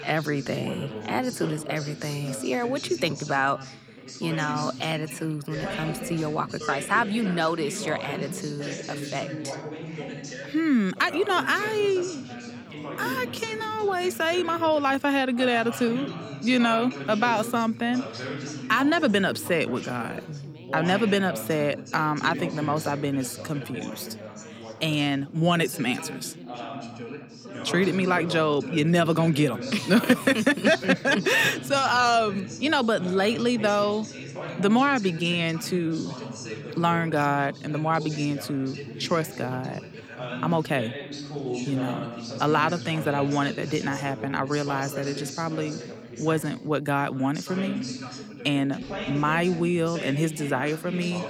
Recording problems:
background chatter; noticeable; throughout; 3 voices, 10 dB below the speech

